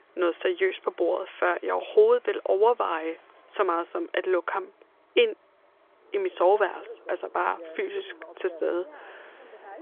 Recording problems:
phone-call audio; nothing above 3.5 kHz
traffic noise; faint; throughout; 25 dB below the speech

